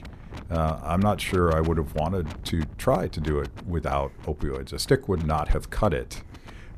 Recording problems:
wind noise on the microphone; occasional gusts; 20 dB below the speech

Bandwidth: 14 kHz